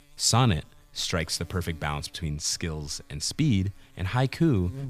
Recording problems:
electrical hum; faint; throughout; 50 Hz, 30 dB below the speech

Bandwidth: 15 kHz